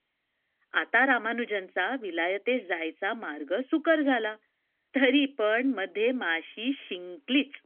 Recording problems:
phone-call audio; nothing above 3.5 kHz
background music; very faint; from 6 s on; 45 dB below the speech

